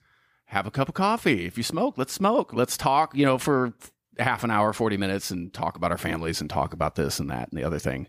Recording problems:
none

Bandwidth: 15 kHz